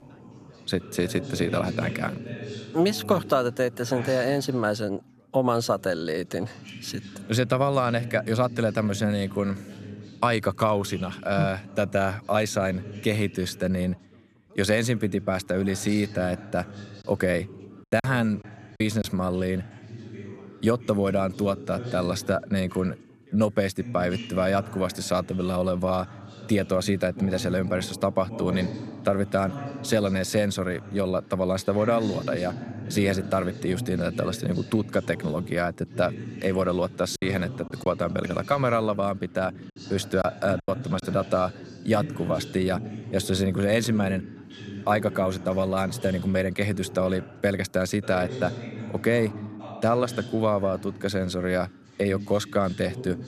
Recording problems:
background chatter; noticeable; throughout; 2 voices, 15 dB below the speech
choppy; very; from 18 to 19 s and from 37 to 41 s; 6% of the speech affected

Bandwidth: 14.5 kHz